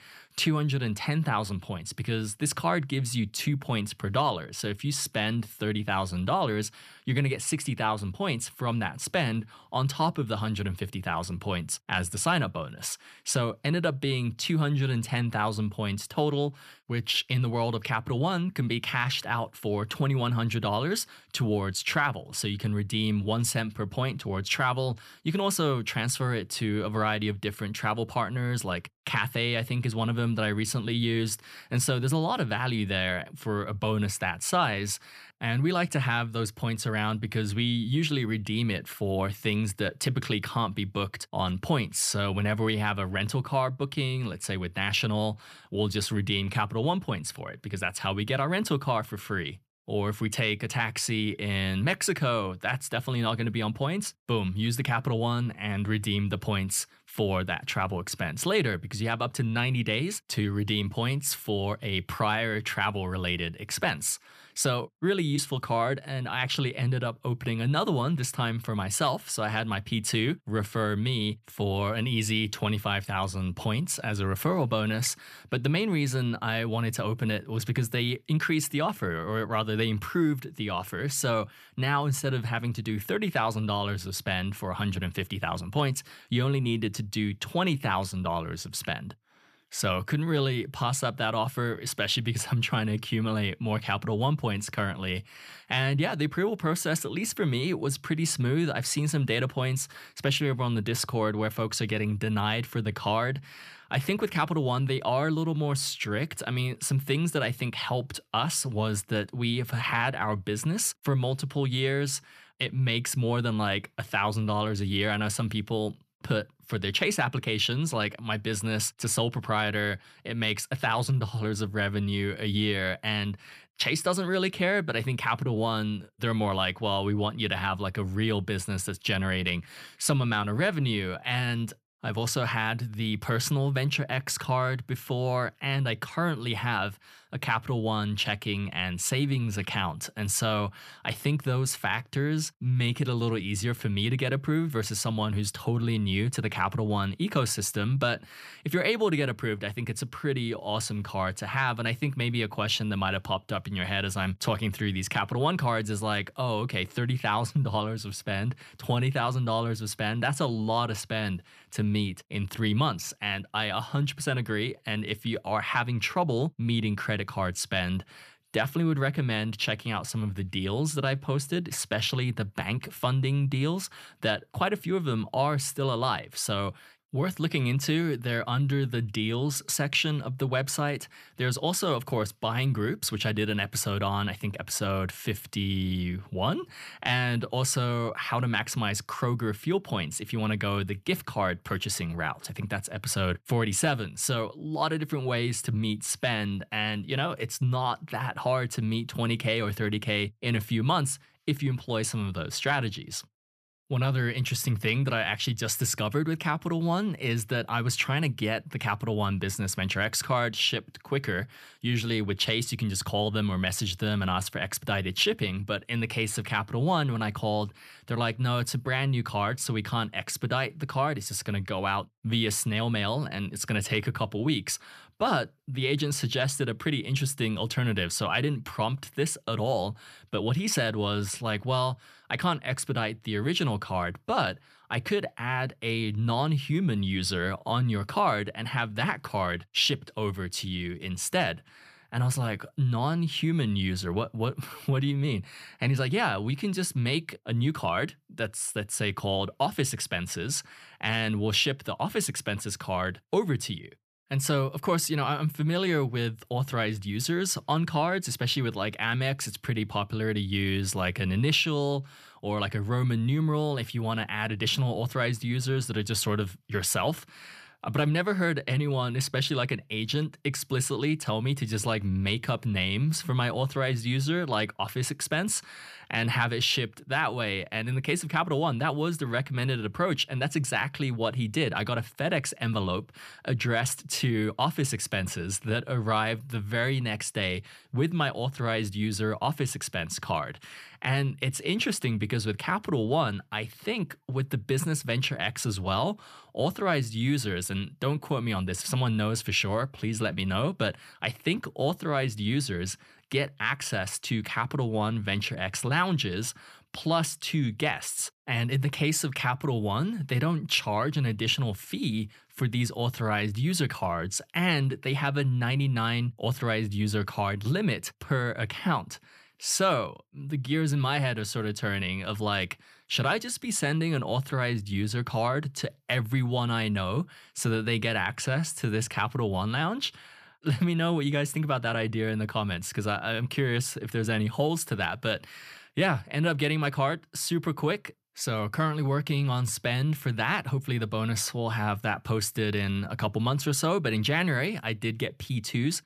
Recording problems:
none

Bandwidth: 14.5 kHz